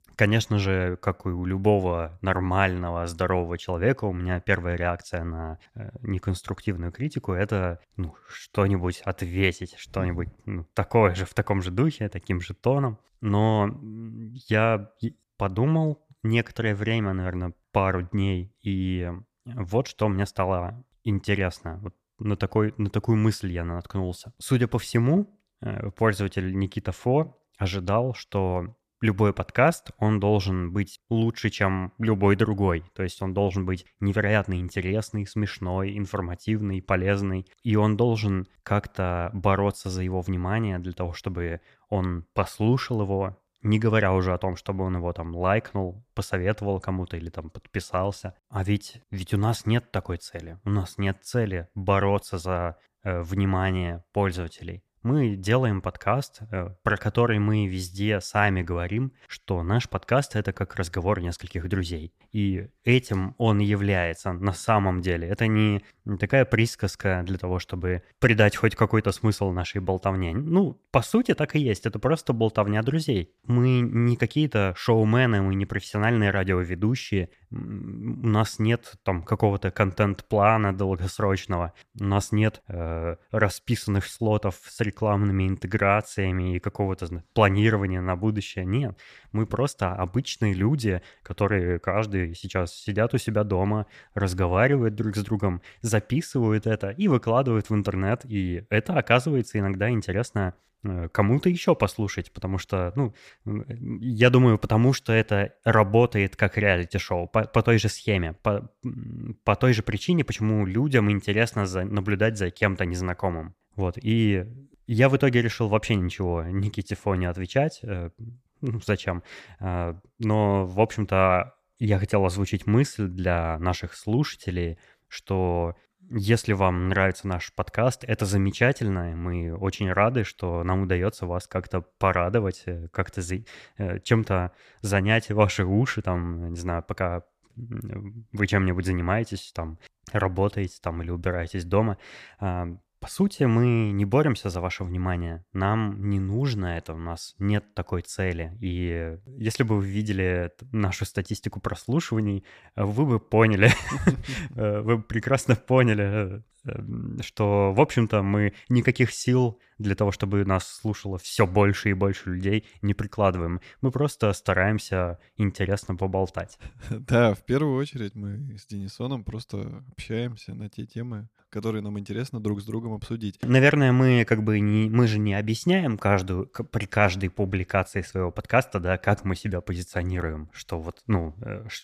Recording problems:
none

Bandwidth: 14.5 kHz